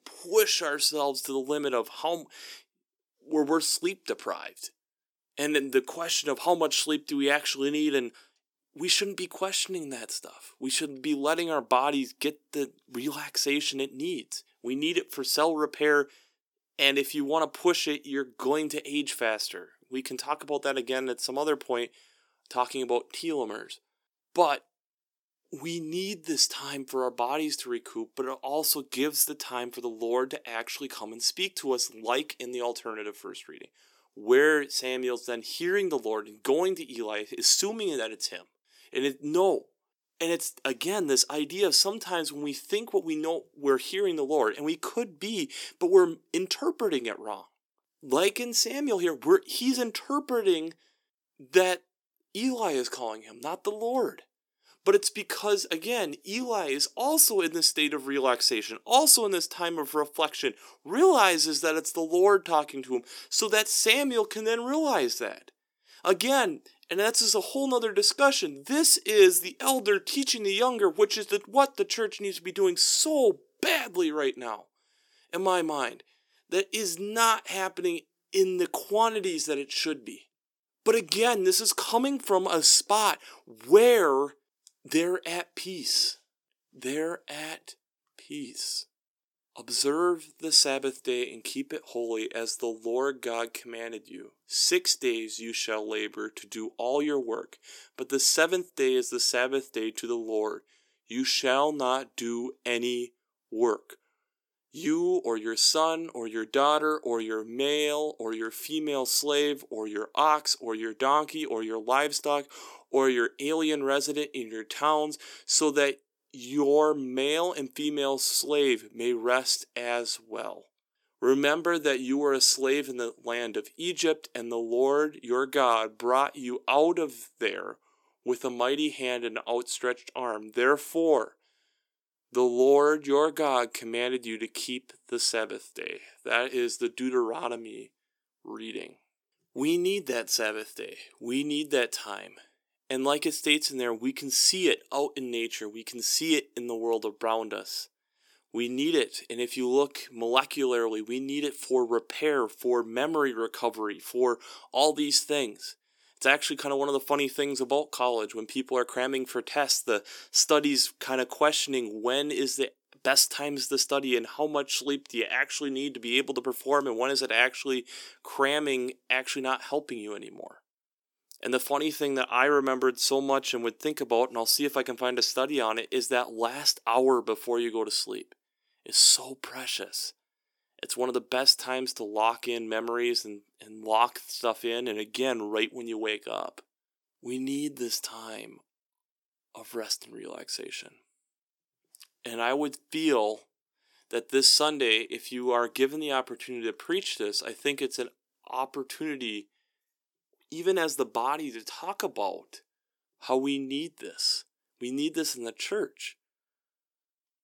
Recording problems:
thin; somewhat; fading below 350 Hz

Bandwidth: 18 kHz